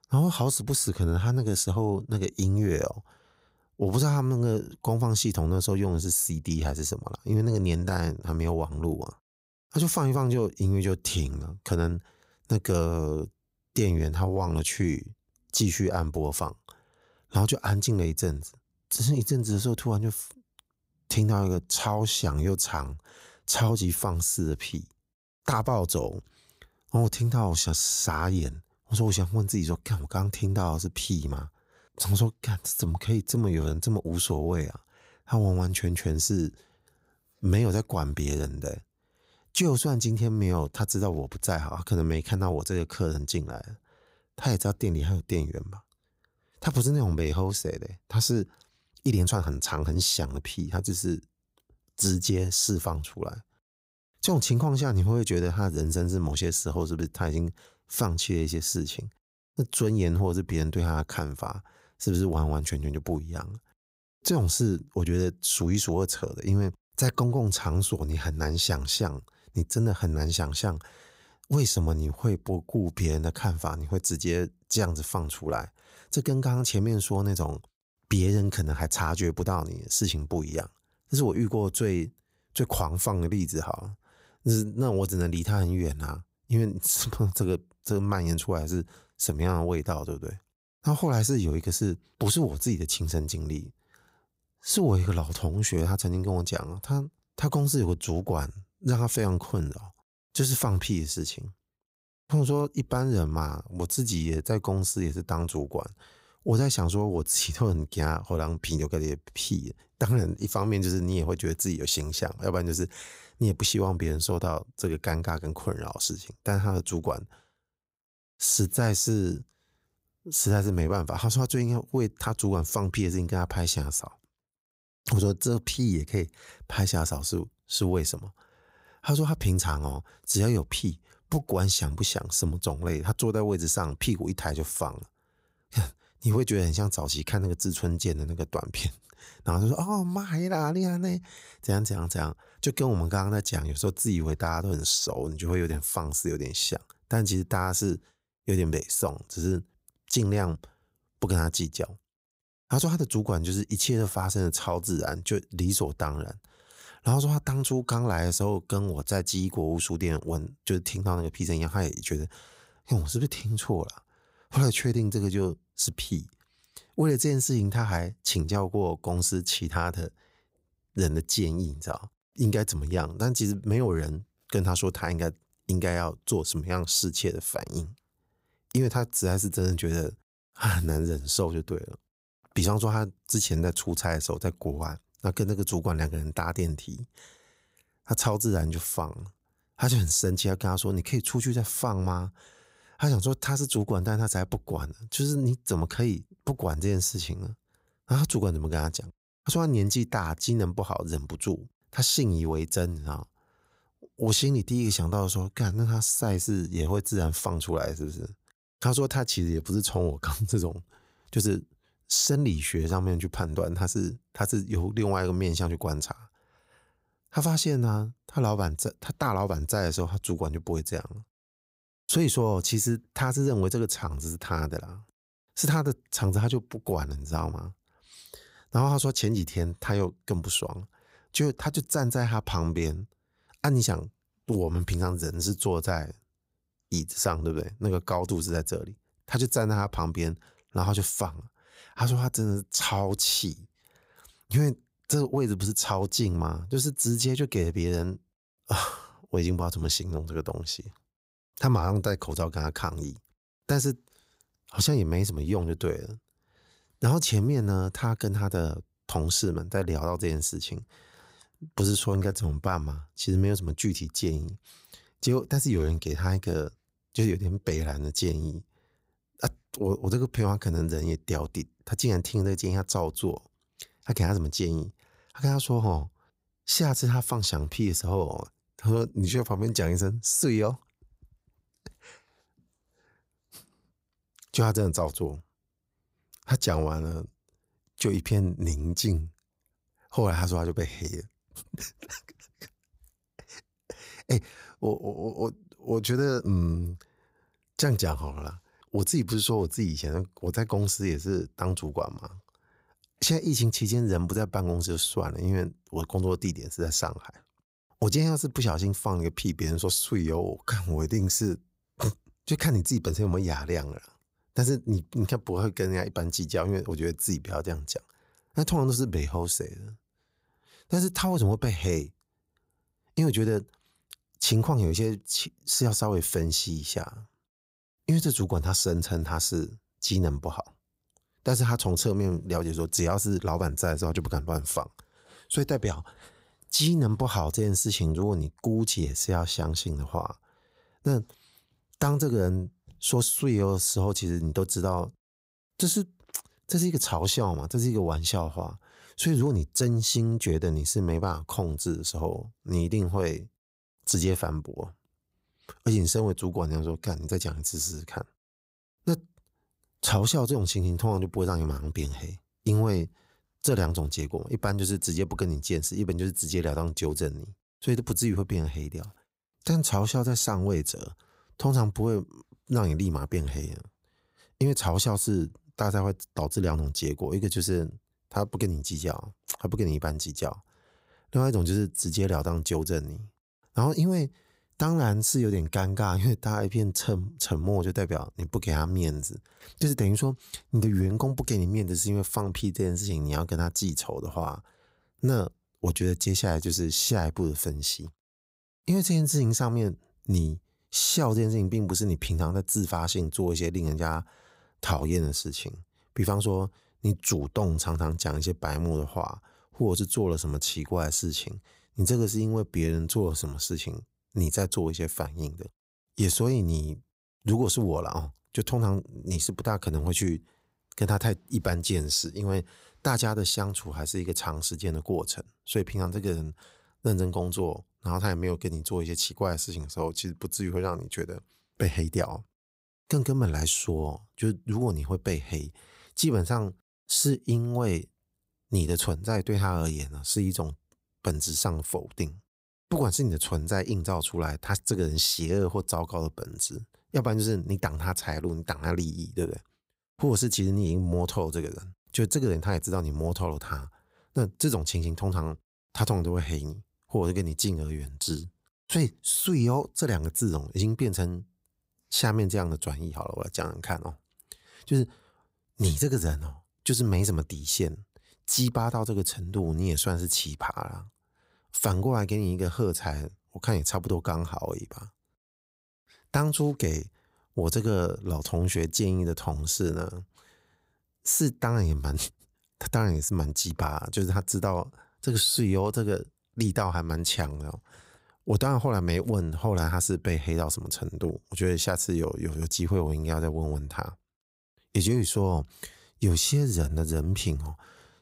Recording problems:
uneven, jittery; strongly; from 49 s to 6:29

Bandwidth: 15.5 kHz